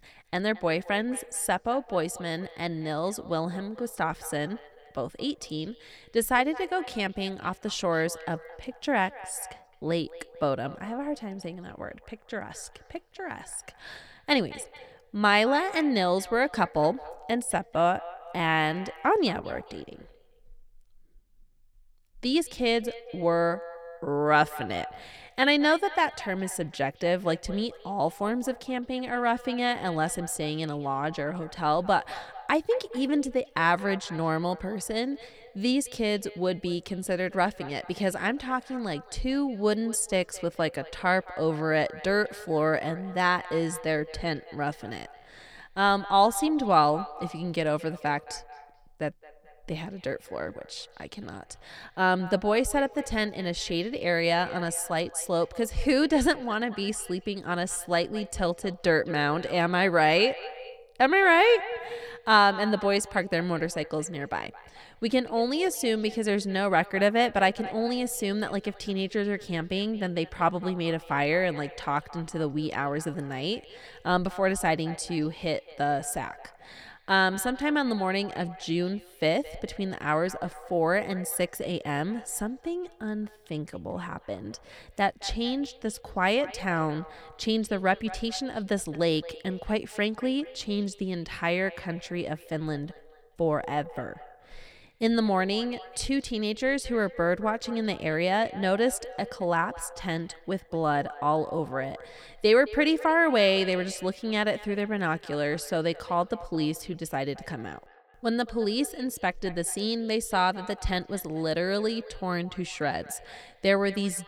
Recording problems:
echo of what is said; noticeable; throughout; 220 ms later, 15 dB below the speech

